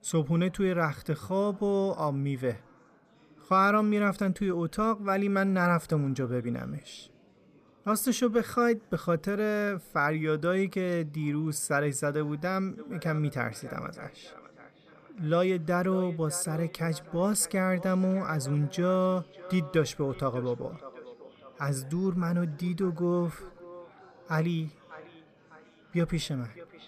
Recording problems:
echo of what is said; faint; from 13 s on; 600 ms later, 20 dB below the speech
chatter from many people; faint; throughout; 30 dB below the speech

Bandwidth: 15 kHz